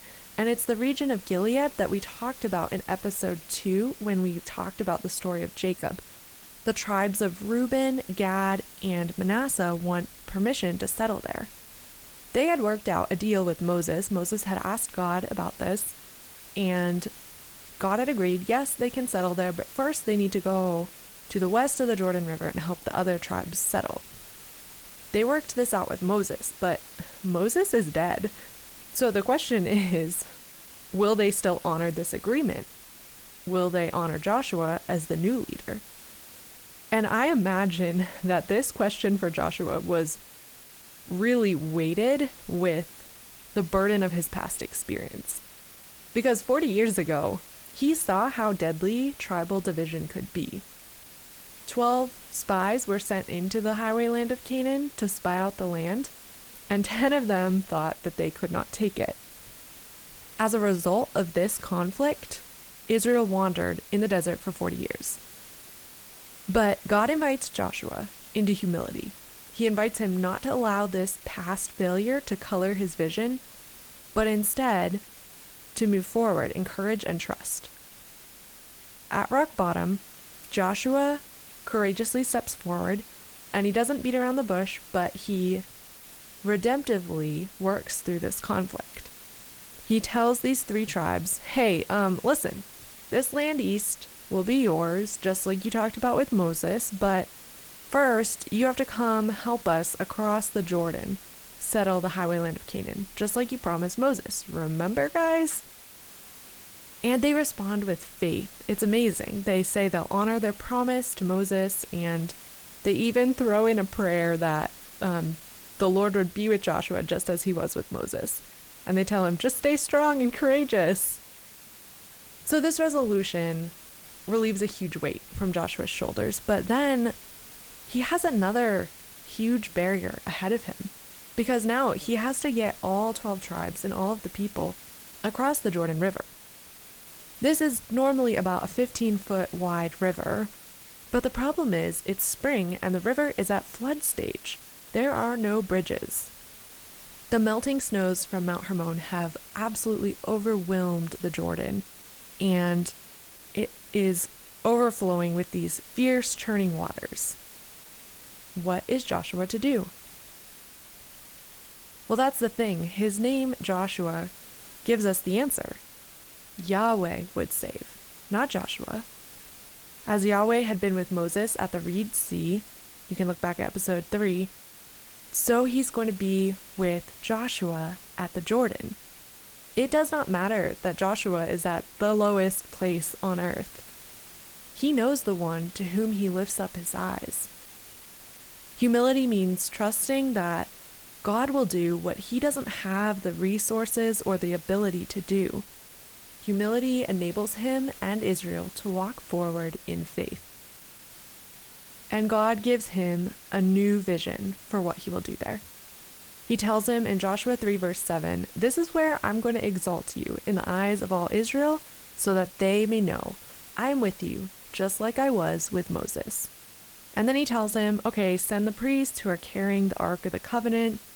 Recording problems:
garbled, watery; slightly
hiss; noticeable; throughout; 15 dB below the speech

